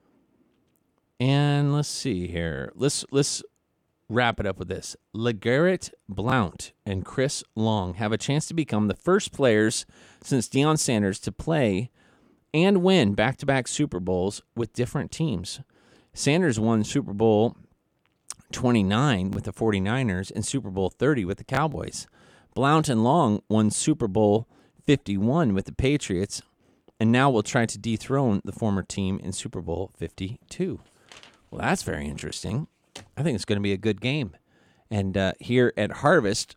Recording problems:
none

